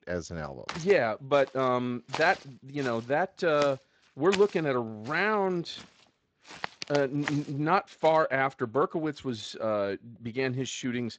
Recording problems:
garbled, watery; slightly
footsteps; noticeable; from 0.5 to 8 s; peak 7 dB below the speech

